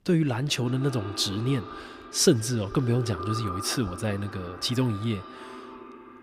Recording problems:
echo of what is said; noticeable; throughout; 150 ms later, 15 dB below the speech

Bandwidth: 15 kHz